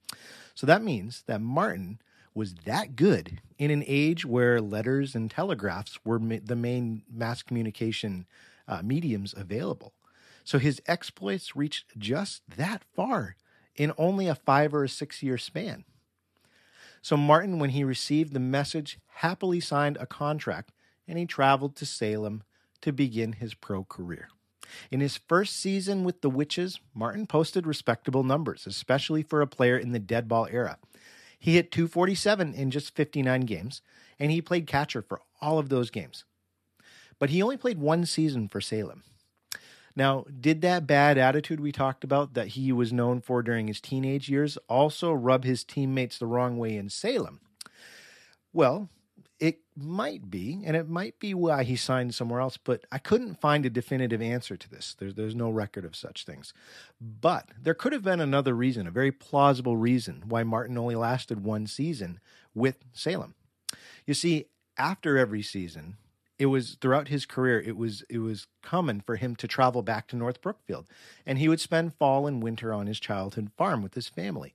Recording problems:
none

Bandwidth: 13.5 kHz